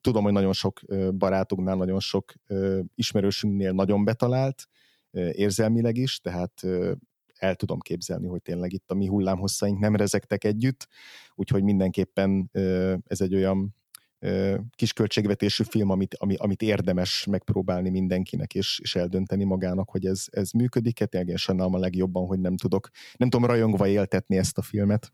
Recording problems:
none

